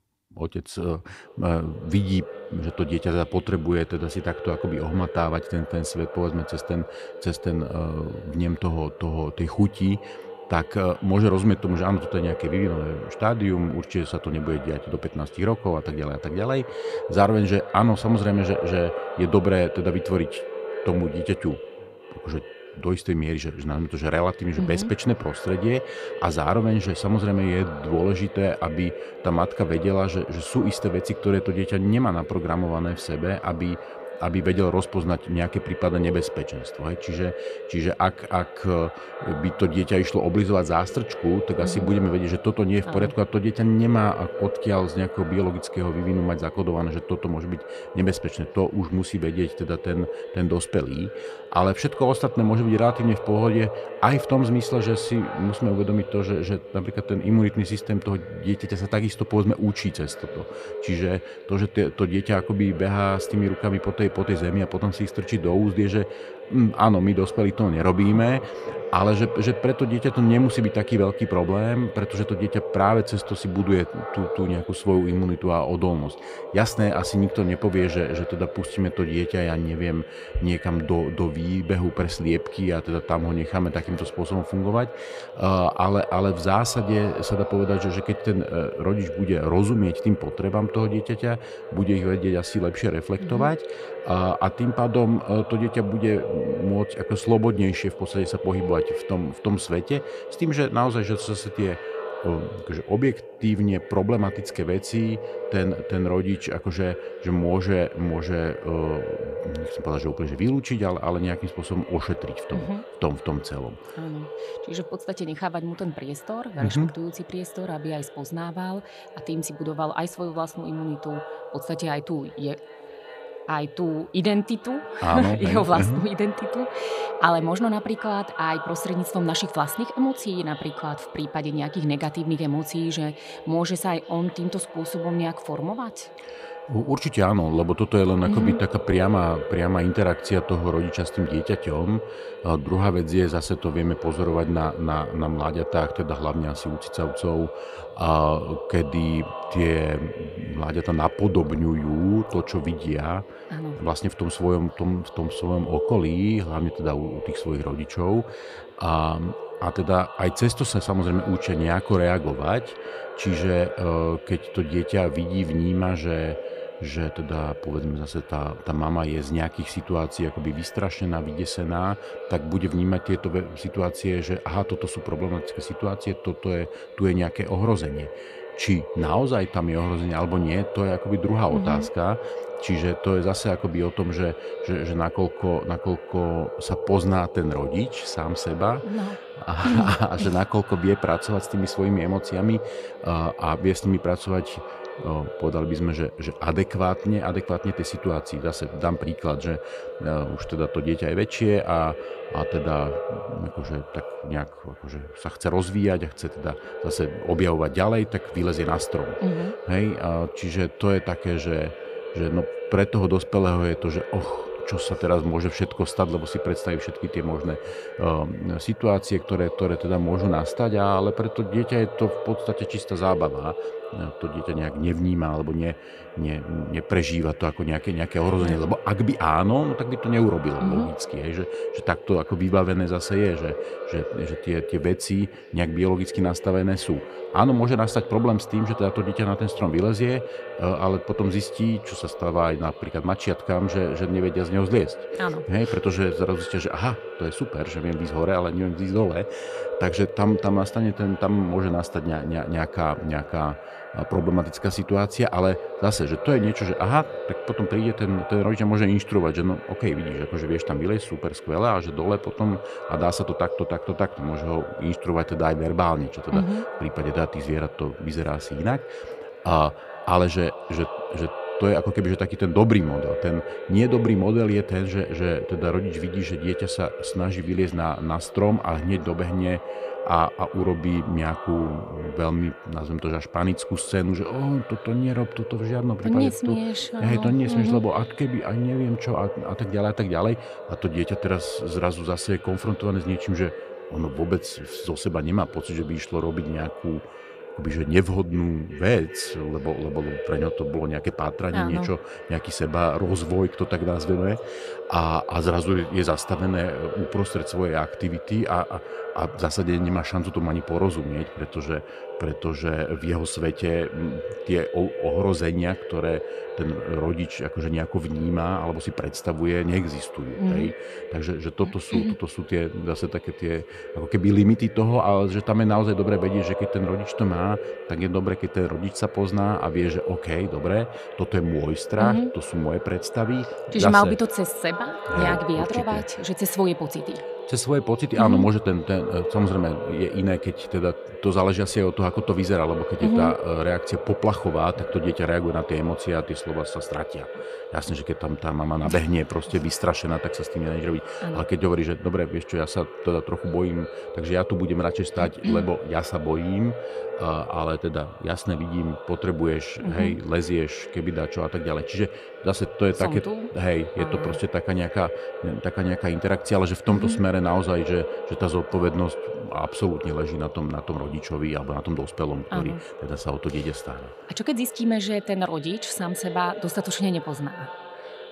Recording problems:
echo of what is said; strong; throughout; 370 ms later, 10 dB below the speech

